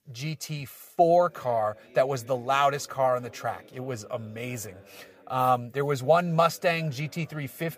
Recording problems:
voice in the background; faint; throughout; 25 dB below the speech

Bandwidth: 15 kHz